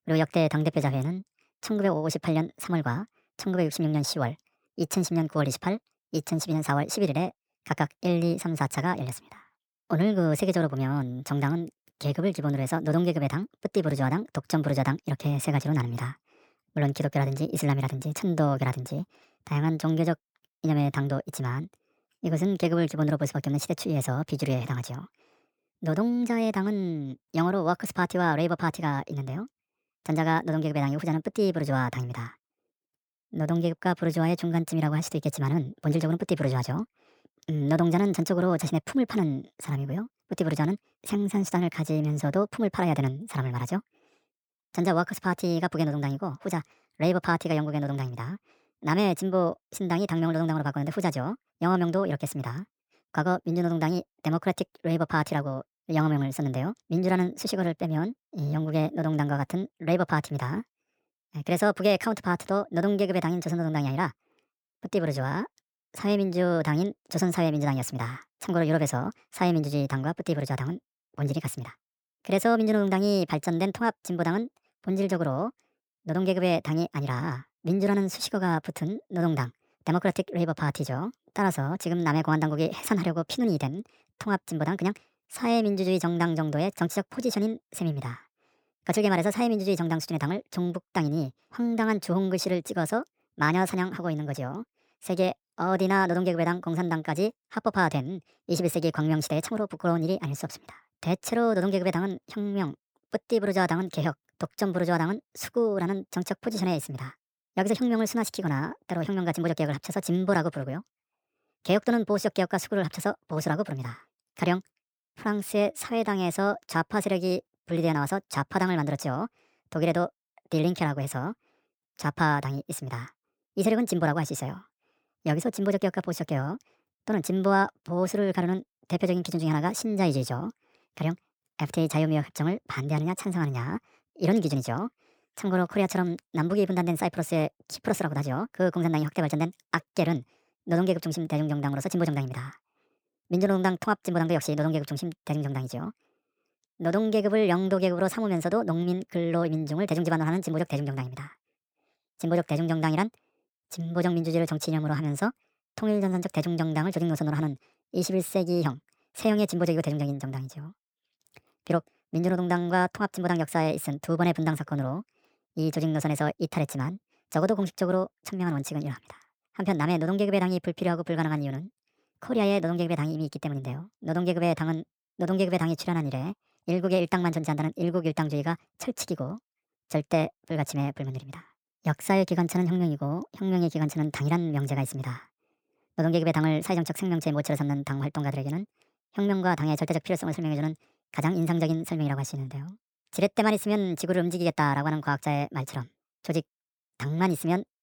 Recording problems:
wrong speed and pitch; too fast and too high; 1.5 times normal speed

